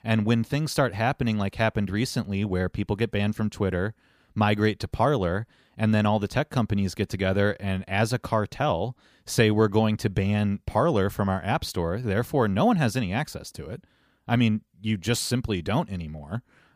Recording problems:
none

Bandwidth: 15 kHz